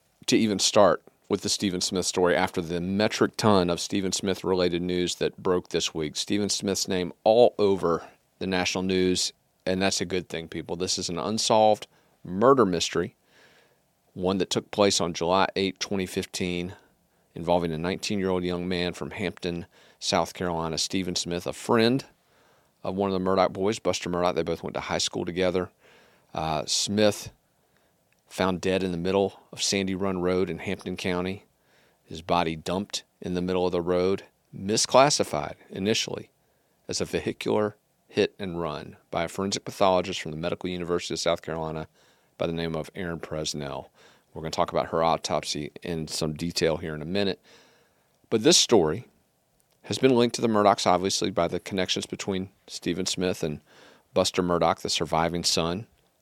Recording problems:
none

